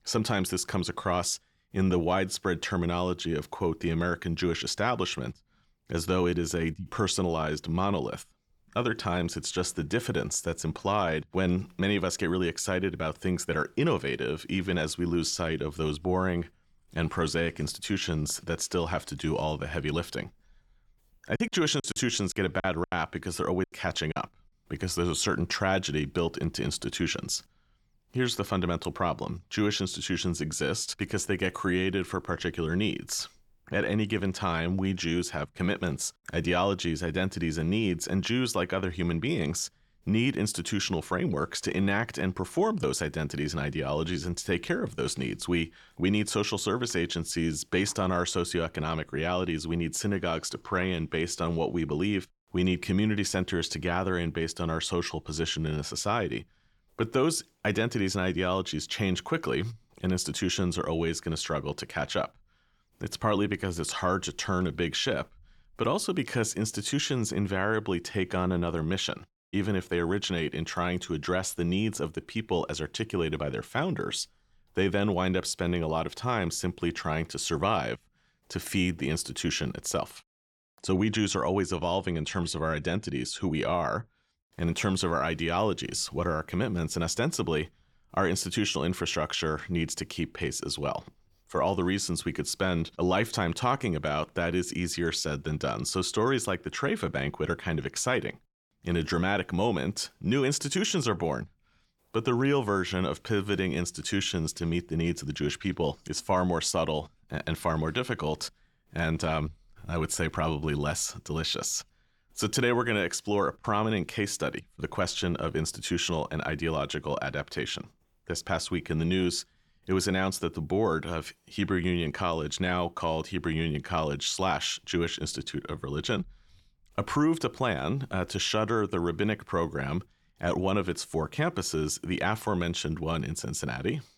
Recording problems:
choppy; very; from 21 to 24 s; 14% of the speech affected

